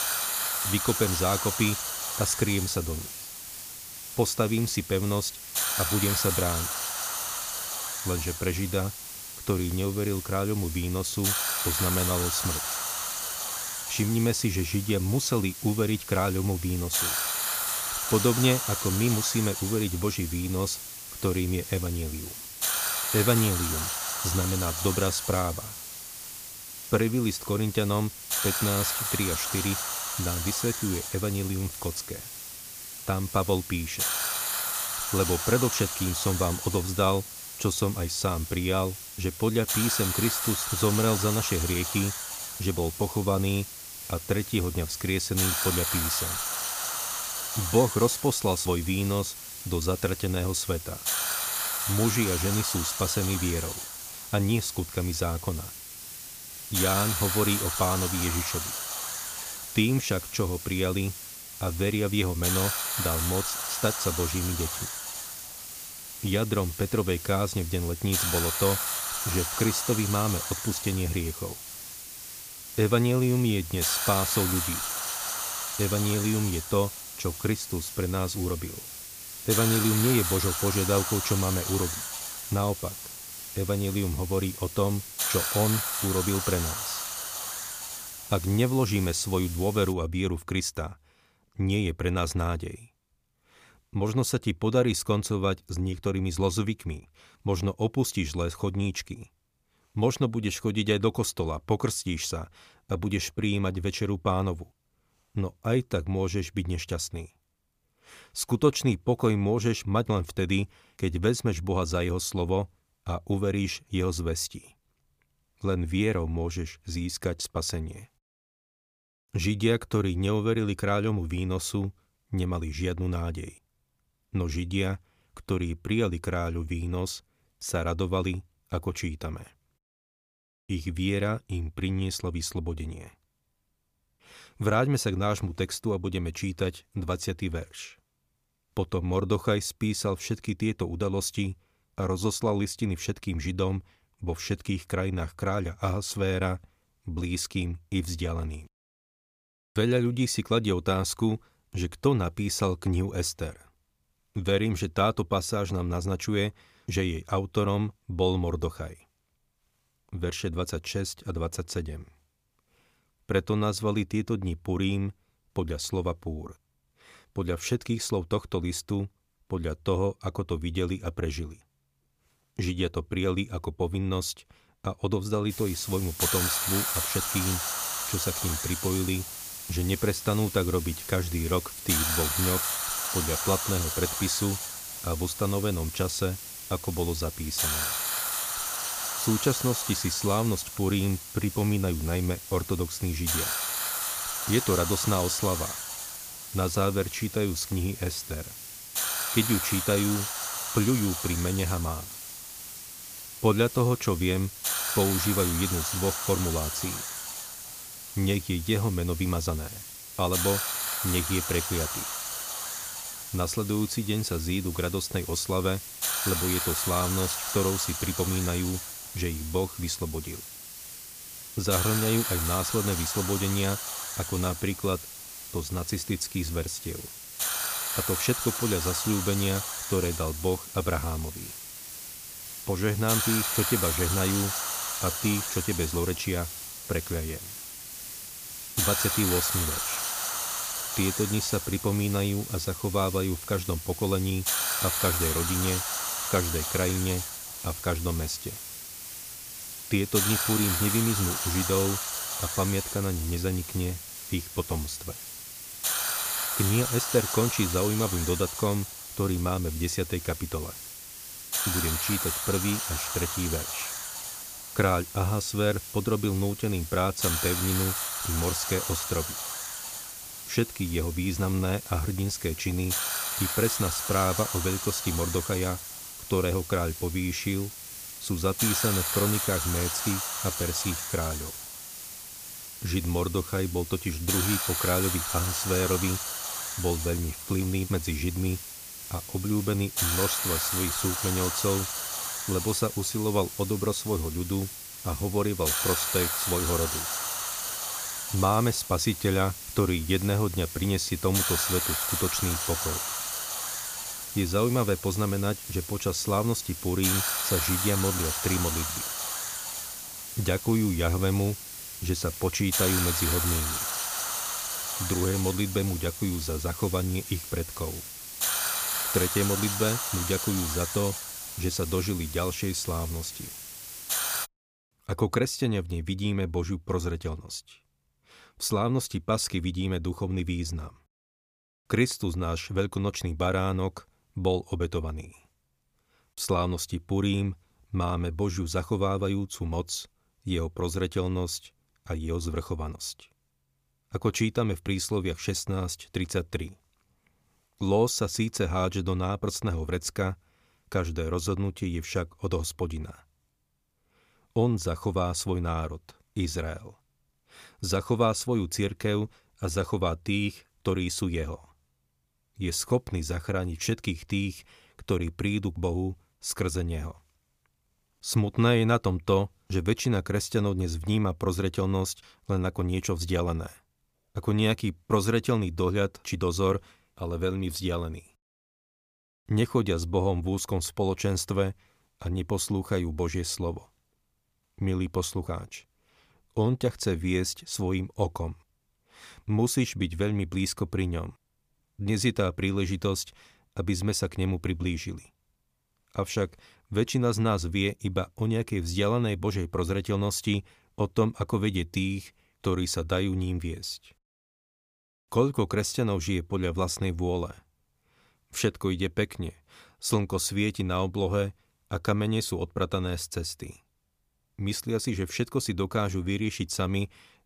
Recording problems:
hiss; loud; until 1:30 and from 2:56 to 5:24; 2 dB below the speech

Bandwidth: 15 kHz